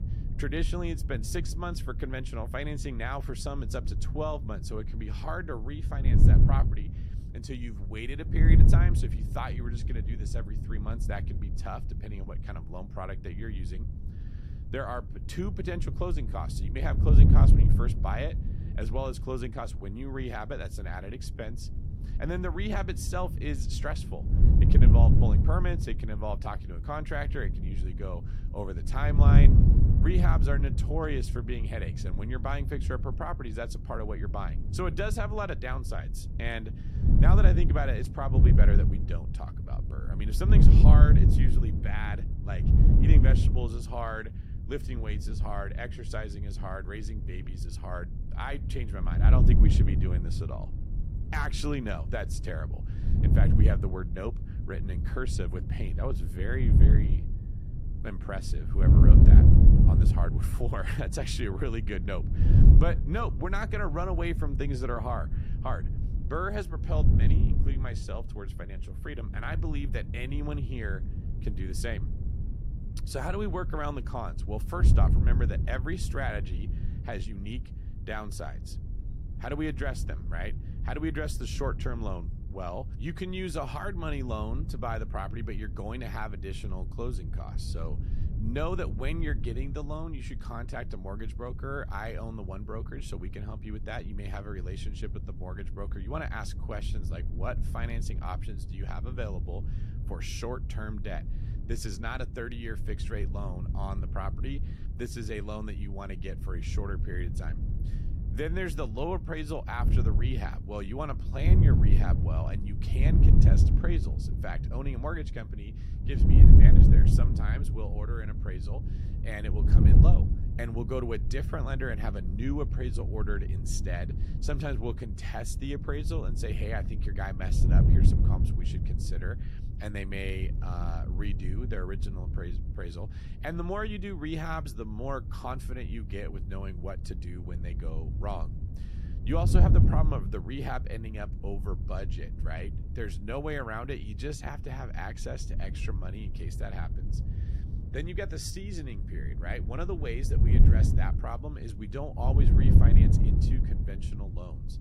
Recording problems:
wind noise on the microphone; heavy; 4 dB below the speech

